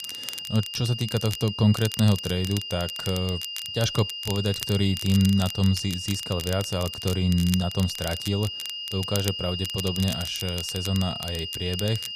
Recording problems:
high-pitched whine; loud; throughout; 3 kHz, 6 dB below the speech
crackle, like an old record; noticeable; 10 dB below the speech

